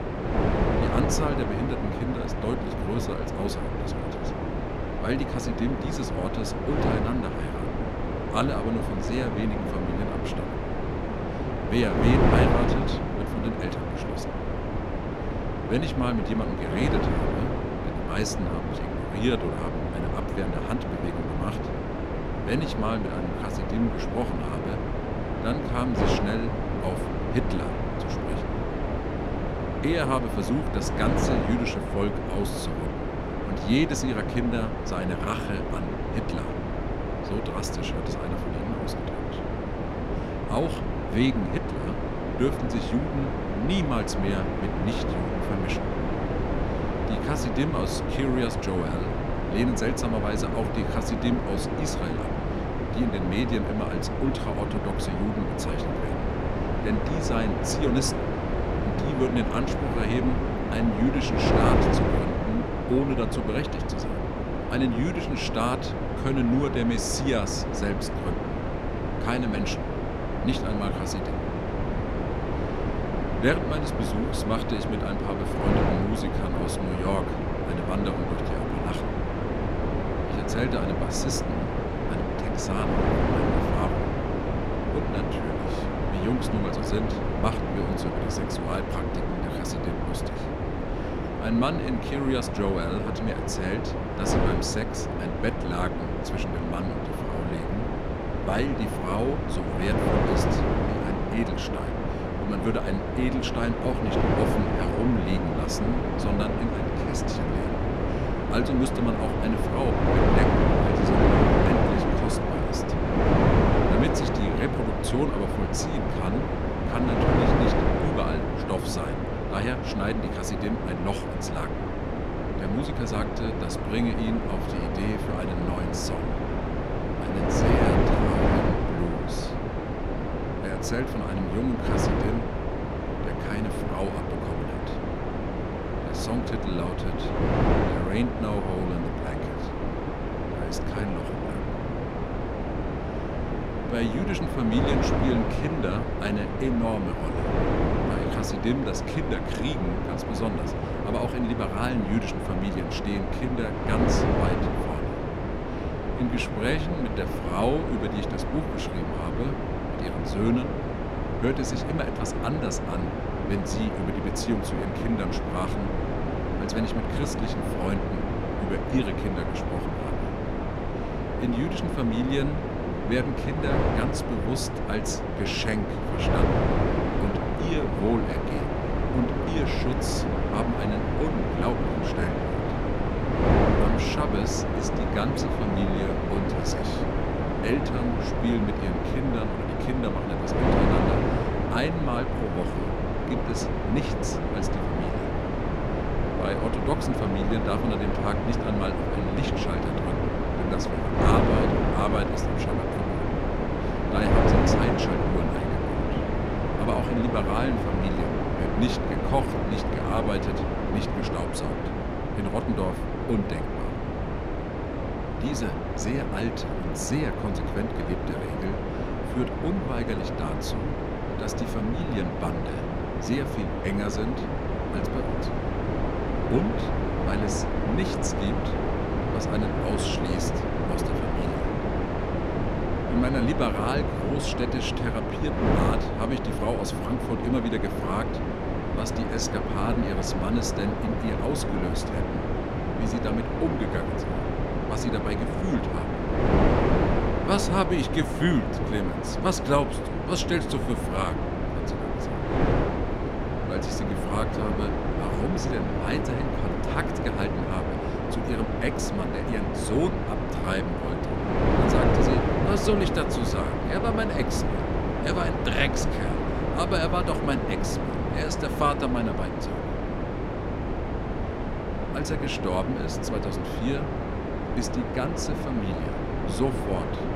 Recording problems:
wind noise on the microphone; heavy; 2 dB above the speech

